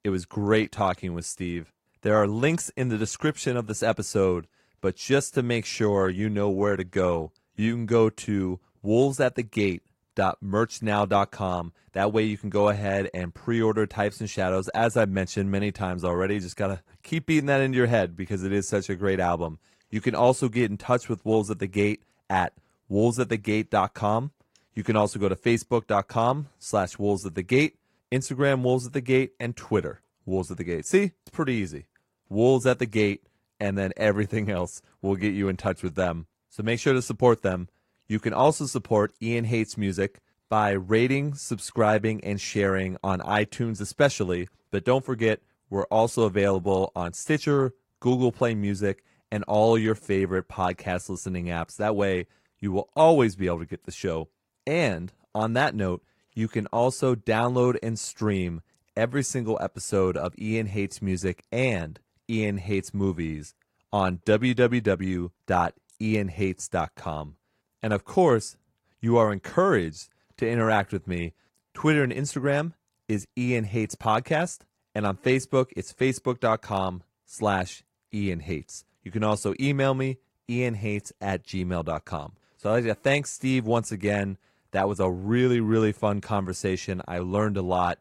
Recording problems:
garbled, watery; slightly

